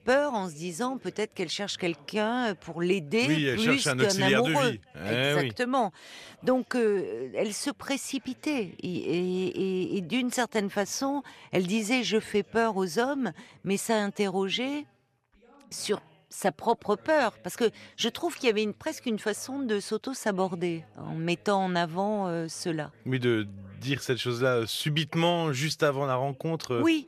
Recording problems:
background chatter; faint; throughout; 2 voices, 30 dB below the speech

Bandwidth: 14 kHz